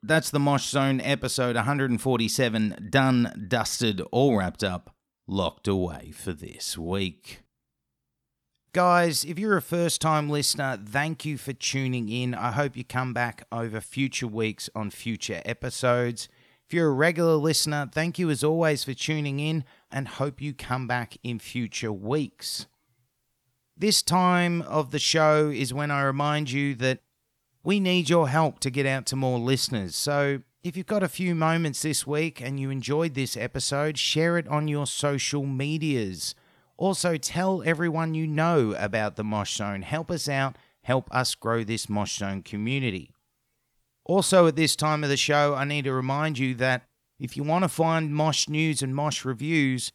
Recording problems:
none

